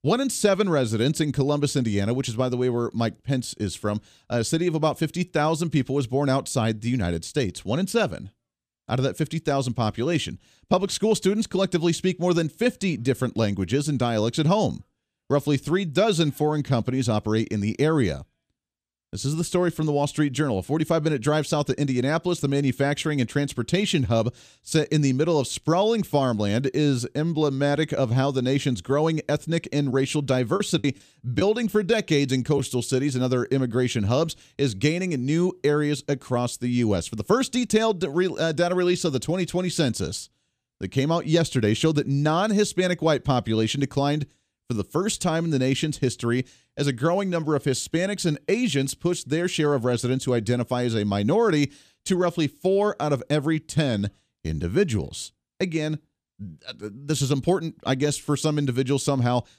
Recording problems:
choppy; occasionally; from 31 to 33 s; 5% of the speech affected

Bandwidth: 14.5 kHz